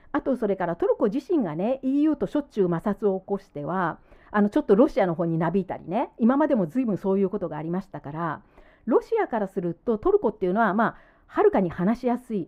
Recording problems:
muffled; very; fading above 3 kHz

